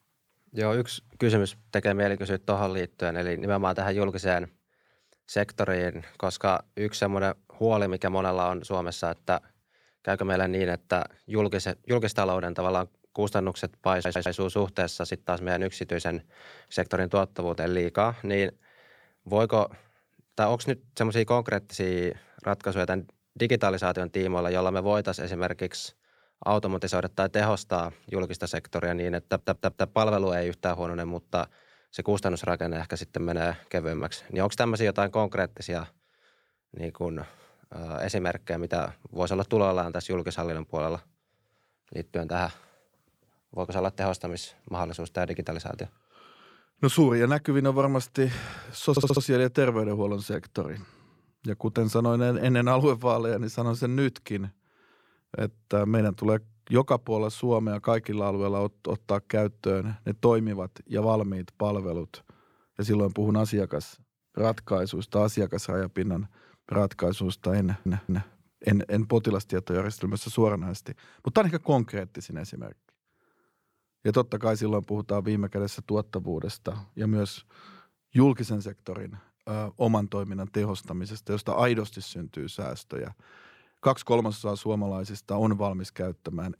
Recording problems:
audio stuttering; 4 times, first at 14 s

